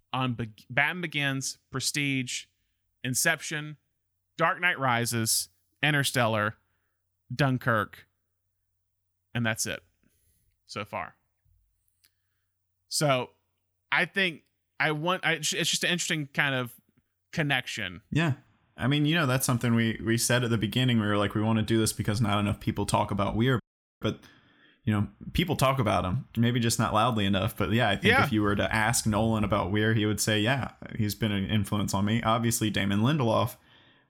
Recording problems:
audio cutting out; at 24 s

